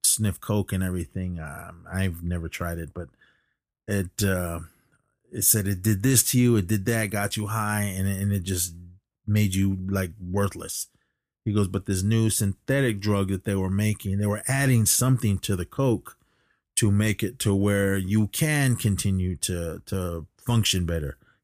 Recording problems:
none

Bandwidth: 15 kHz